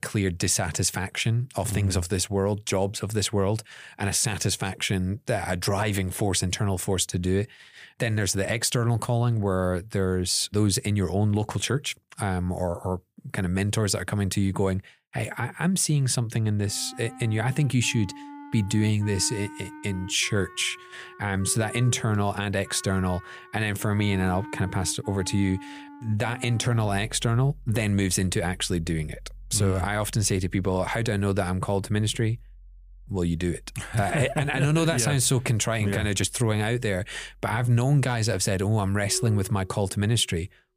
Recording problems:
background music; noticeable; from 17 s on; 20 dB below the speech

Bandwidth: 15 kHz